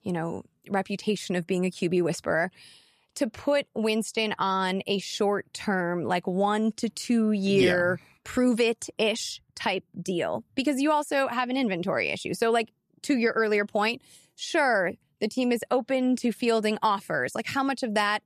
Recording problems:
none

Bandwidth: 14 kHz